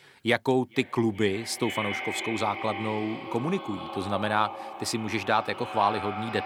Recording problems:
echo of what is said; strong; throughout; 430 ms later, 7 dB below the speech

